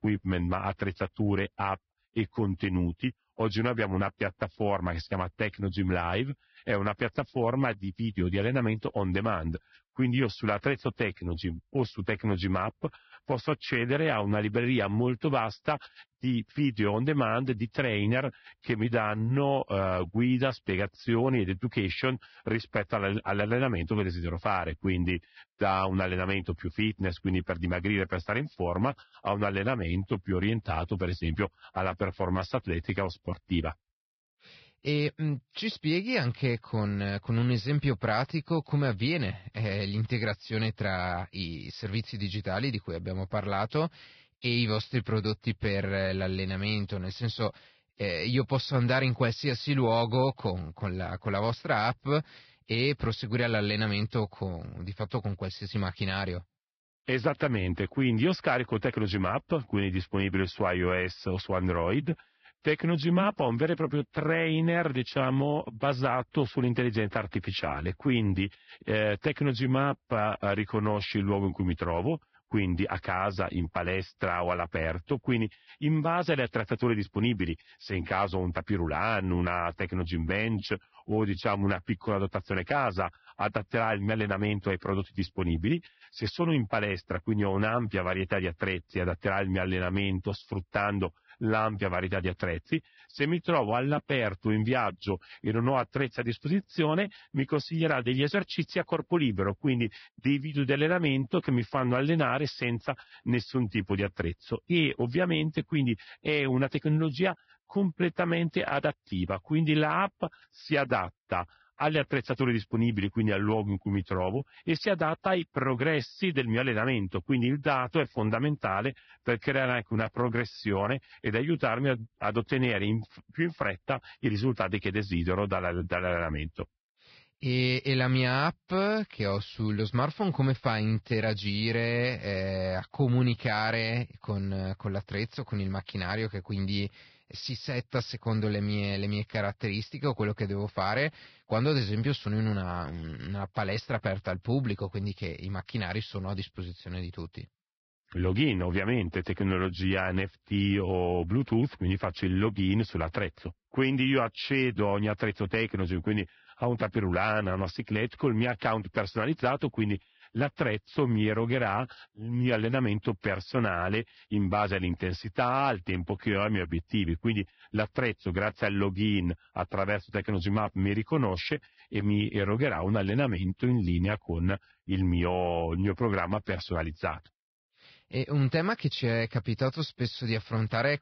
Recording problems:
garbled, watery; badly; nothing above 5 kHz

